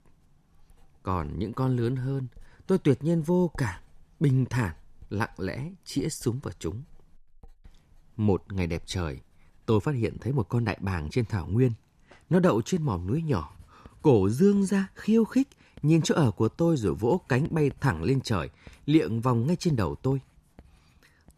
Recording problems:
household noises; faint; throughout; 30 dB below the speech

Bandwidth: 14 kHz